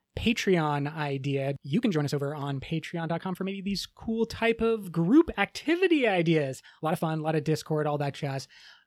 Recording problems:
uneven, jittery; strongly; from 1.5 to 8.5 s

